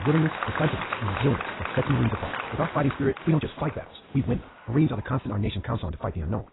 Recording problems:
garbled, watery; badly; nothing above 4 kHz
wrong speed, natural pitch; too fast; 1.6 times normal speed
crowd noise; loud; throughout; 6 dB below the speech
abrupt cut into speech; at the start

